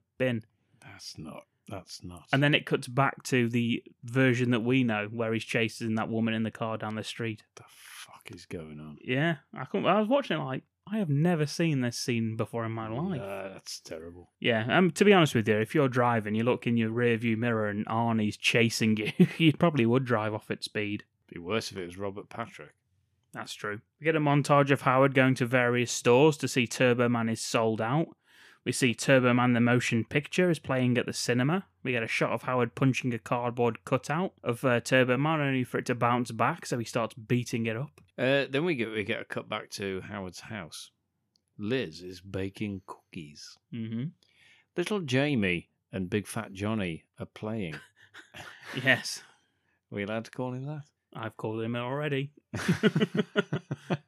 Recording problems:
none

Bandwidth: 14.5 kHz